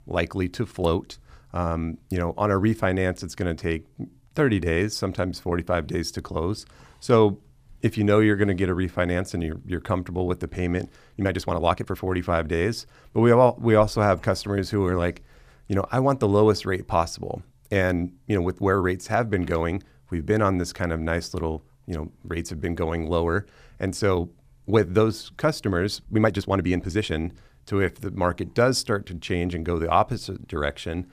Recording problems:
uneven, jittery; strongly; from 4 to 27 s

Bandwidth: 15 kHz